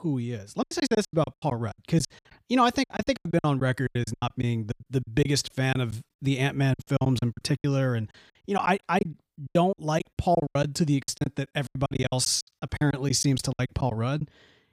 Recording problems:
choppy; very; 20% of the speech affected

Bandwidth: 15 kHz